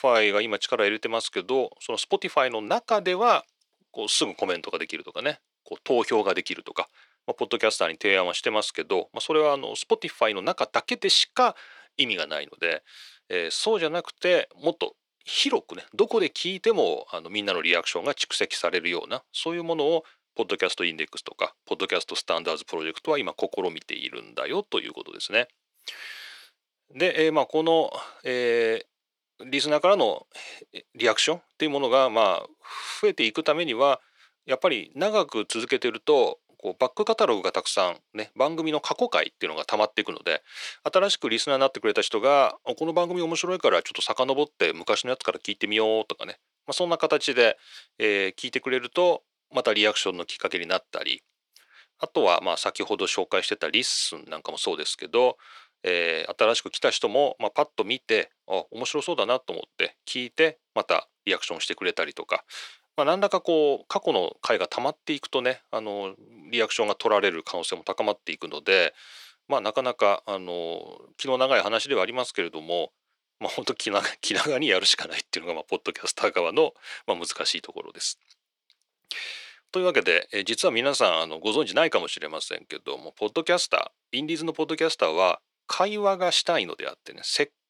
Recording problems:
thin; somewhat; fading below 450 Hz

